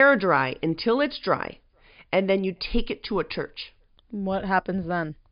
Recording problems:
high frequencies cut off; noticeable; nothing above 5 kHz
abrupt cut into speech; at the start

